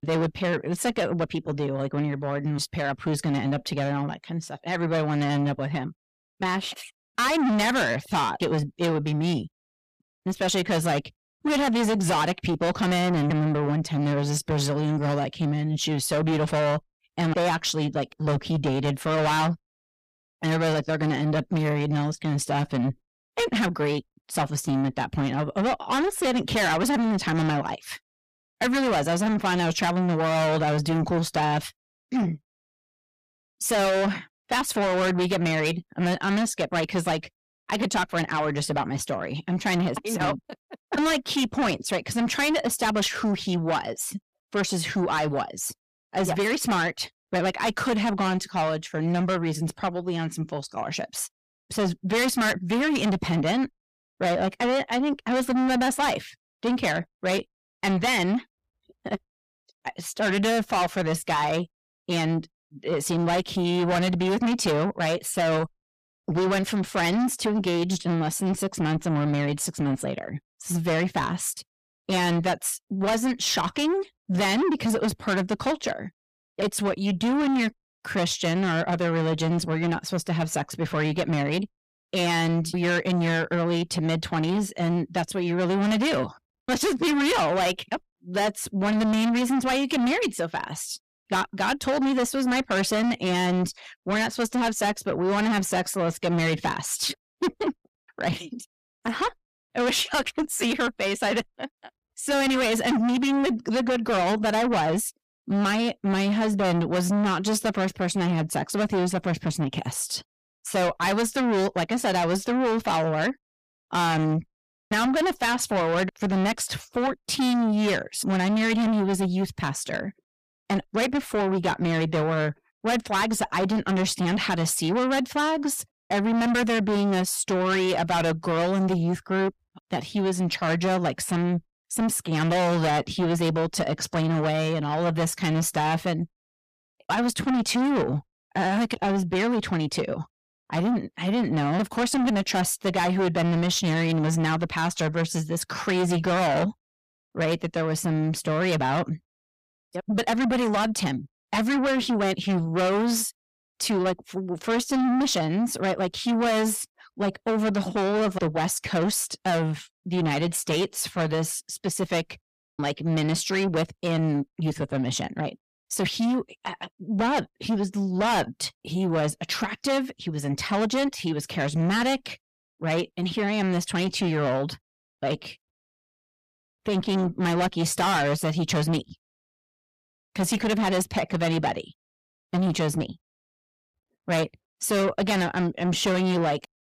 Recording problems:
distortion; heavy; 6 dB below the speech

